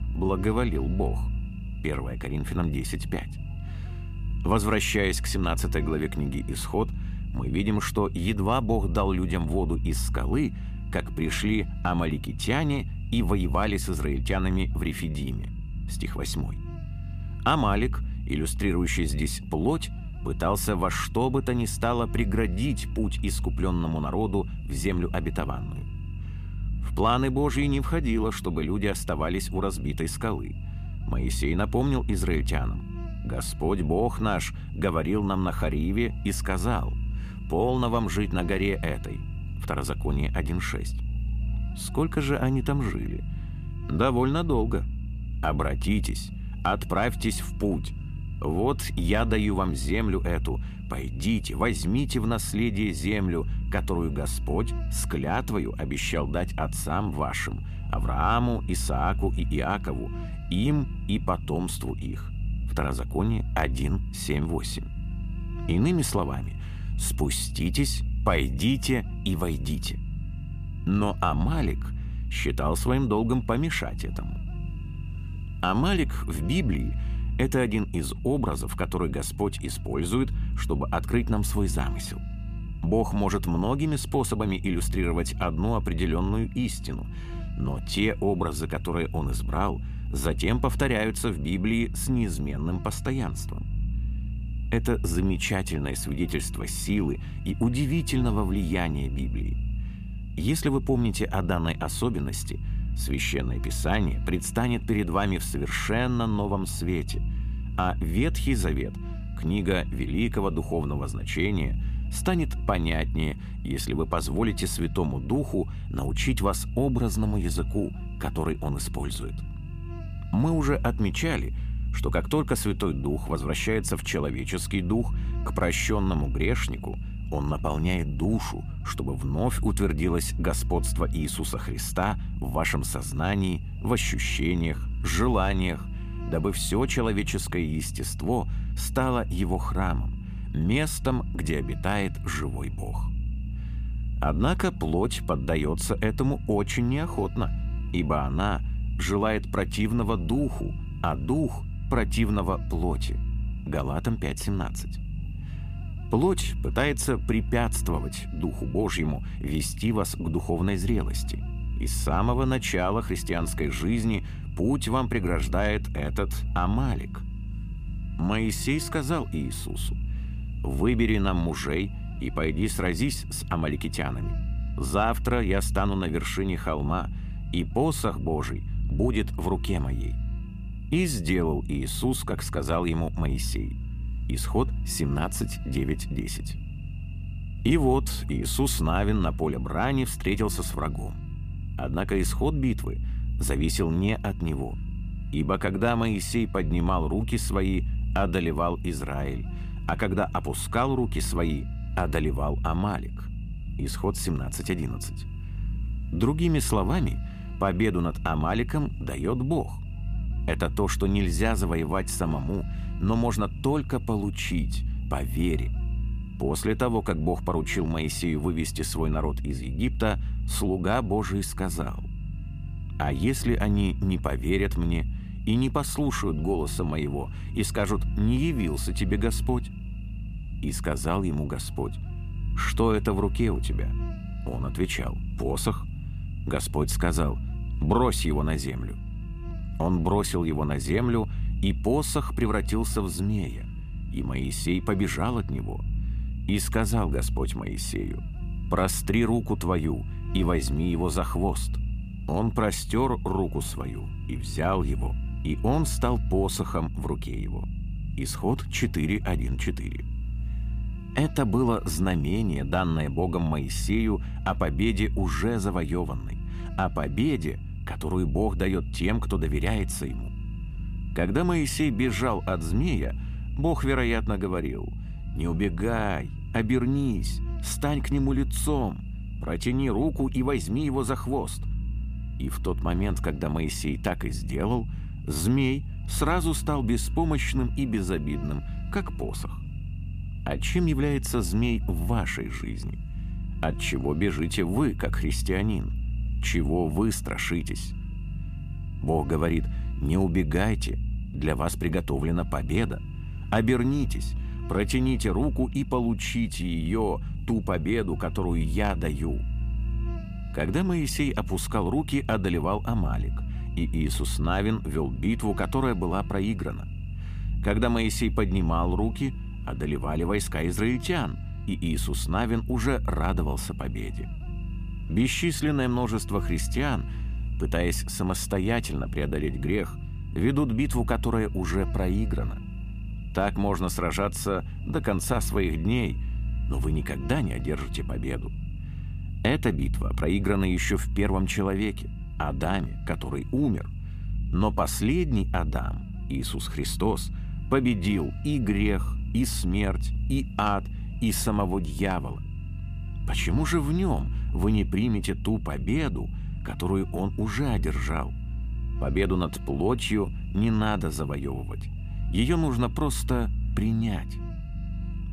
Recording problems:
low rumble; noticeable; throughout; 20 dB below the speech
electrical hum; faint; throughout; 50 Hz, 25 dB below the speech

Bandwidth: 15 kHz